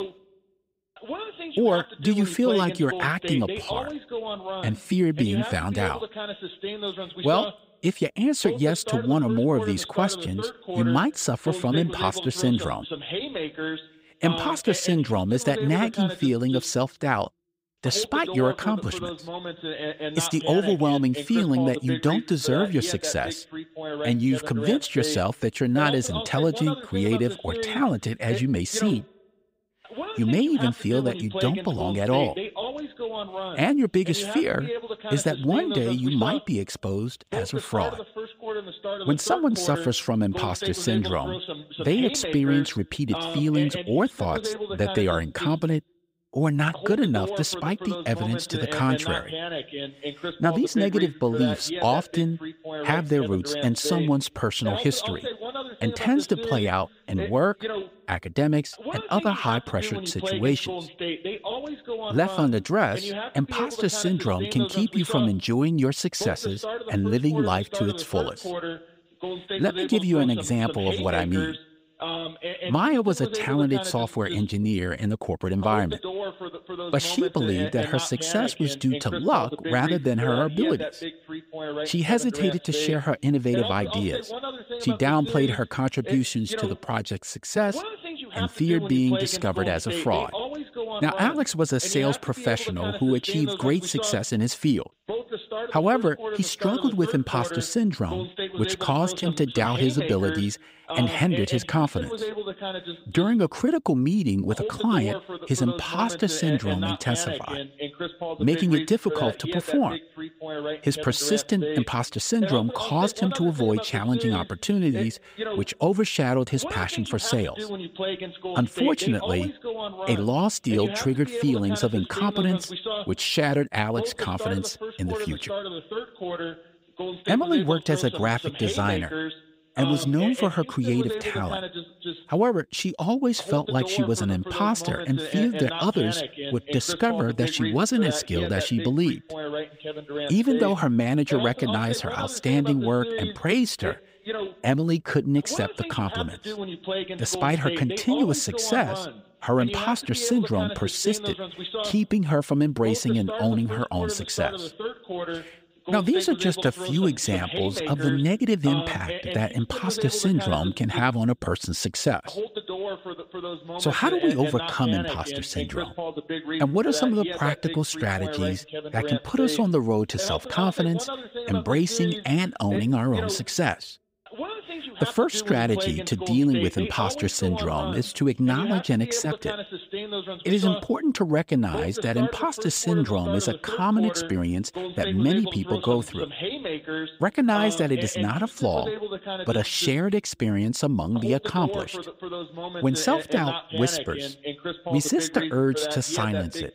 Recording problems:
voice in the background; loud; throughout; 8 dB below the speech

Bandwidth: 15.5 kHz